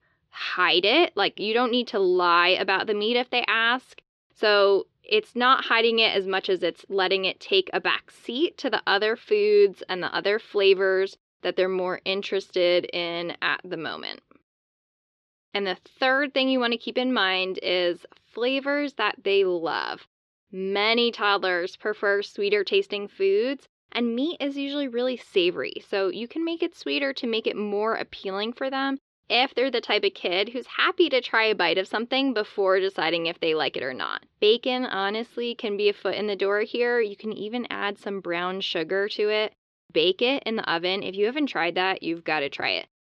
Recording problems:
muffled; very slightly; fading above 4 kHz

